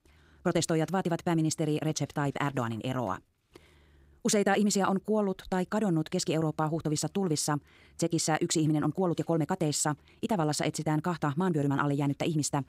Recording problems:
wrong speed, natural pitch; too fast; 1.7 times normal speed

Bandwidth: 15.5 kHz